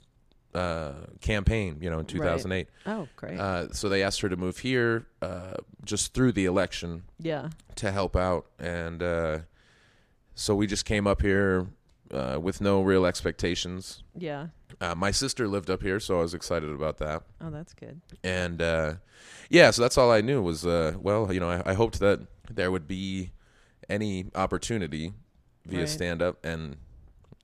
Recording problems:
none

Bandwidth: 14.5 kHz